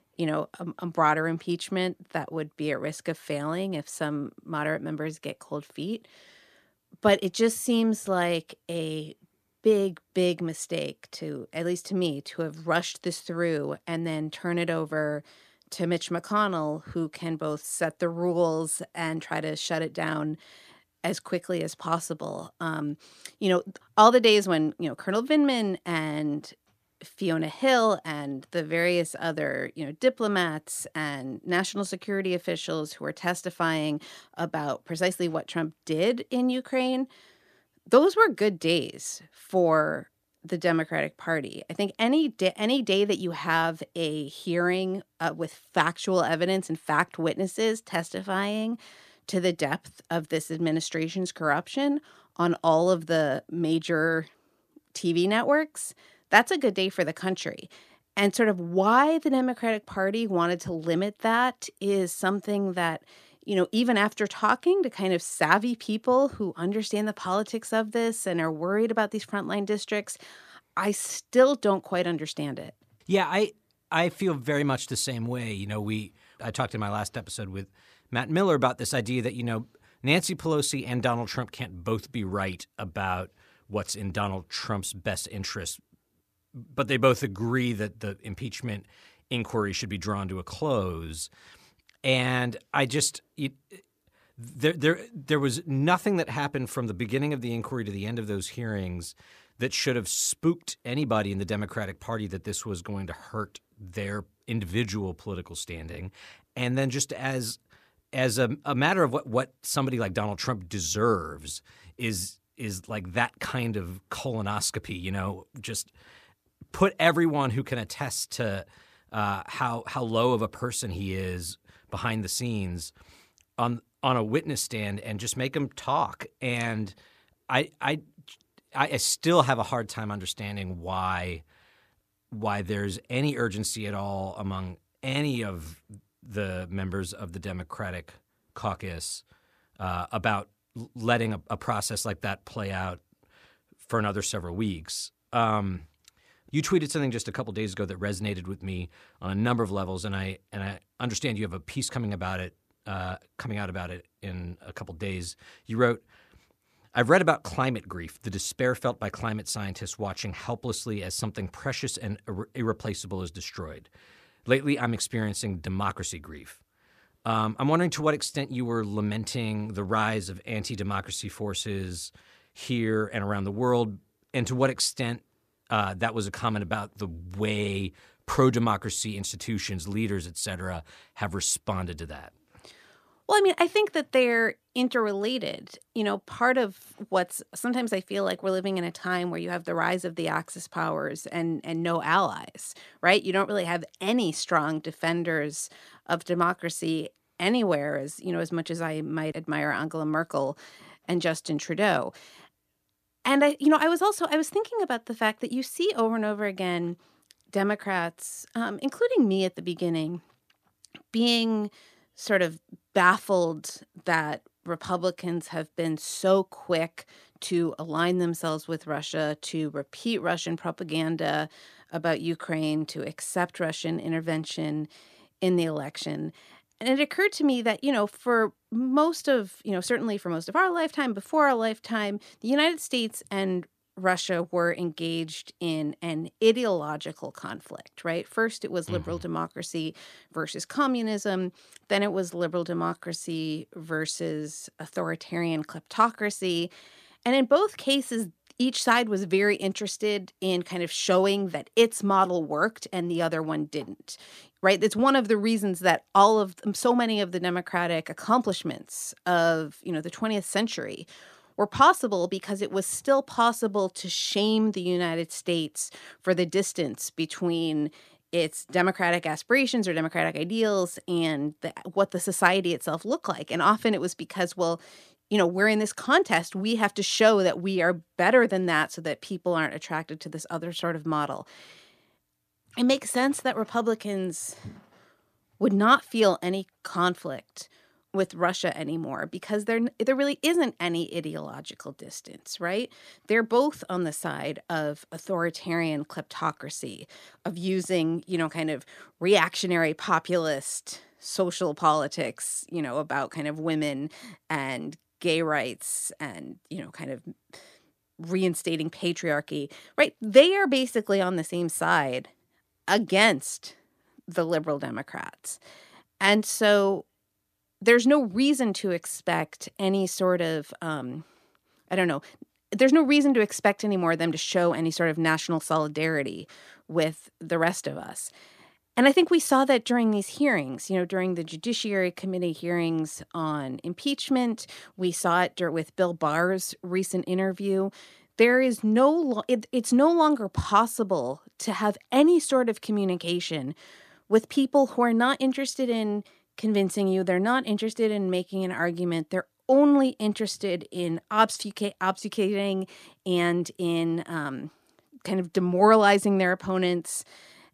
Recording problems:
none

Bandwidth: 14.5 kHz